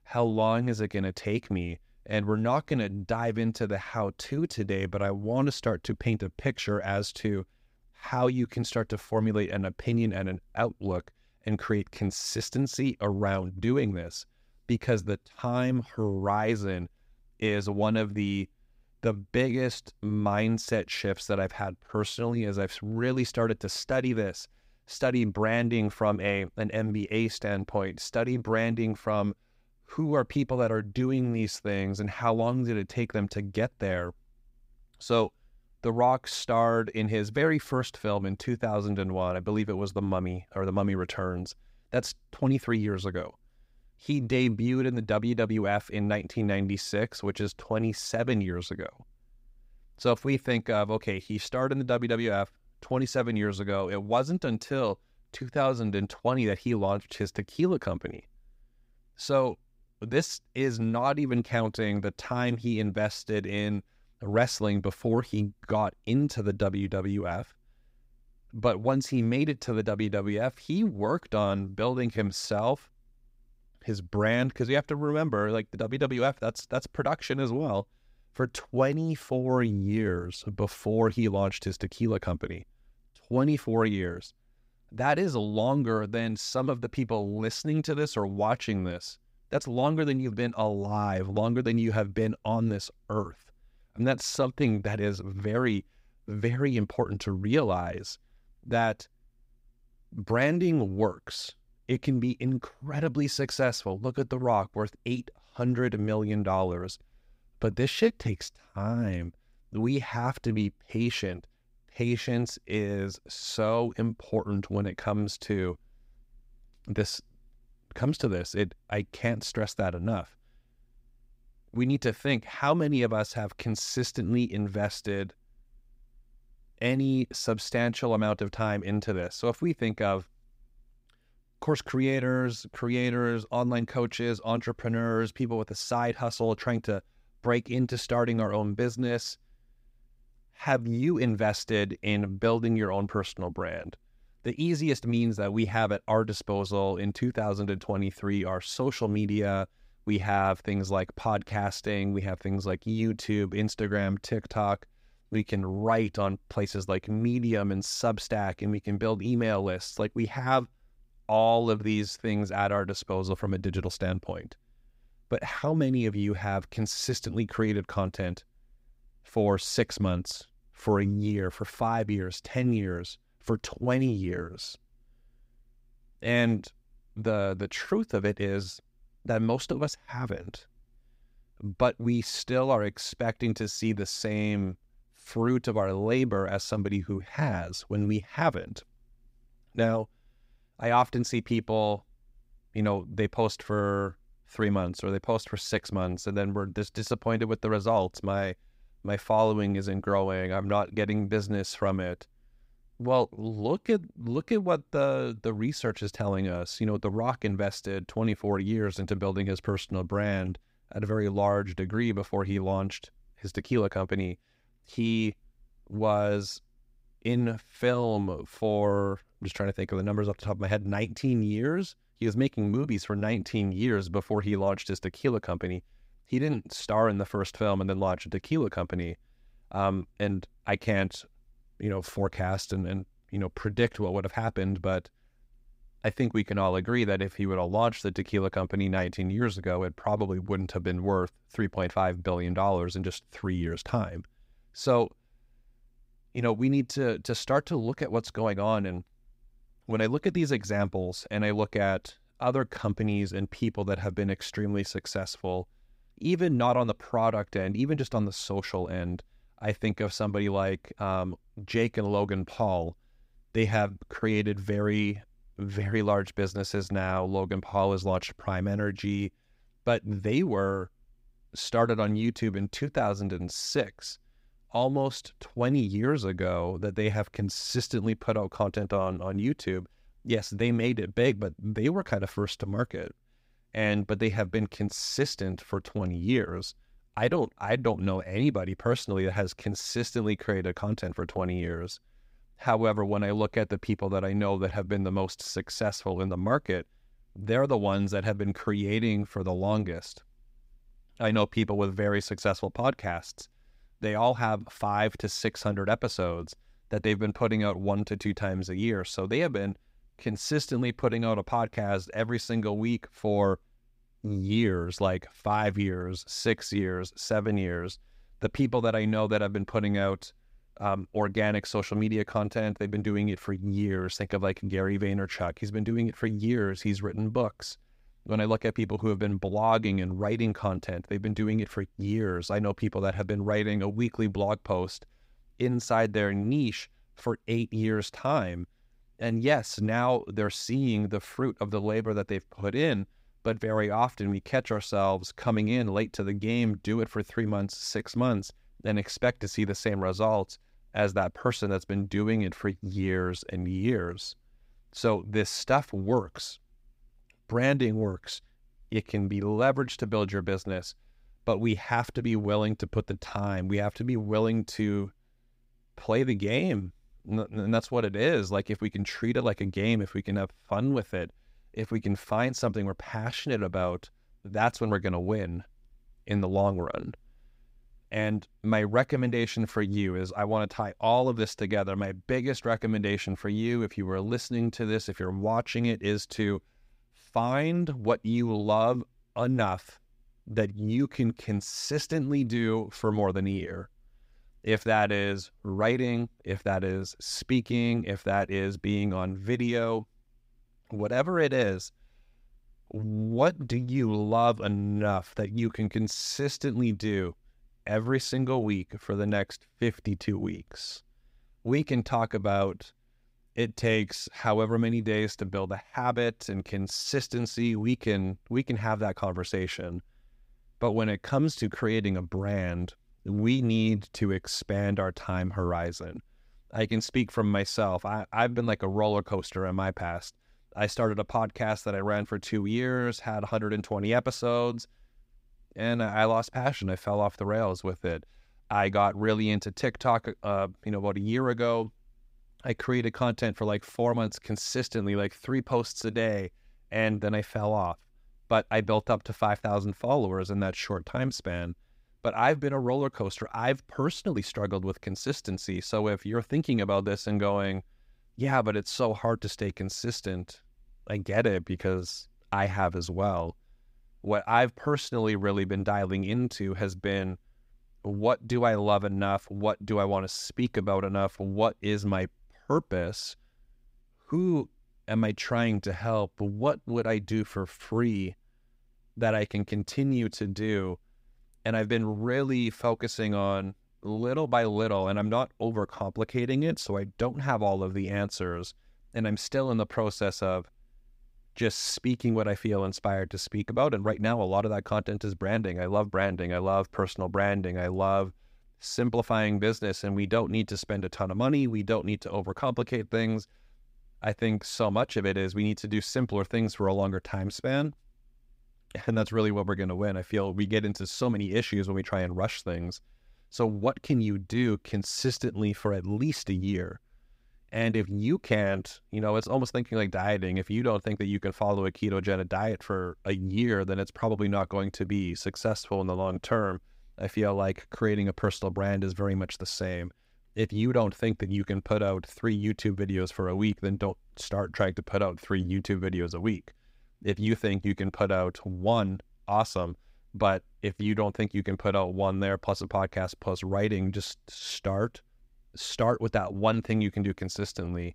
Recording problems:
none

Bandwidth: 15.5 kHz